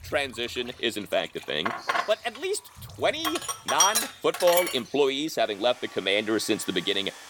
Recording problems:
household noises; loud; throughout; as loud as the speech
animal sounds; faint; throughout; 20 dB below the speech

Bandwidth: 17.5 kHz